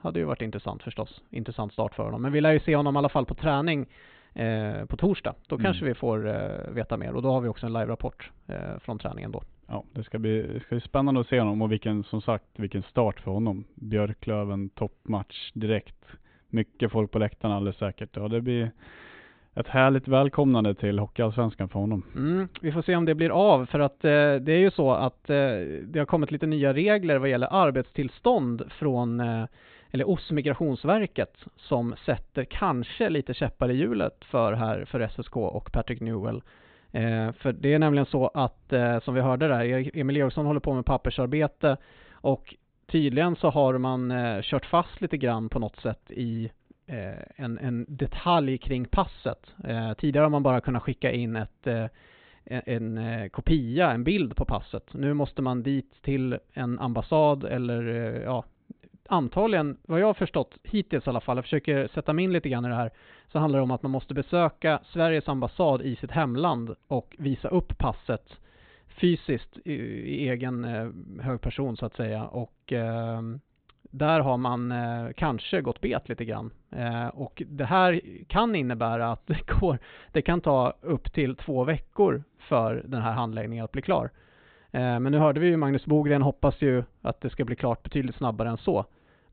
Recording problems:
high frequencies cut off; severe; nothing above 4 kHz

